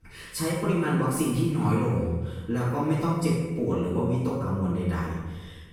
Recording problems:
room echo; strong; dies away in 1.1 s
off-mic speech; far

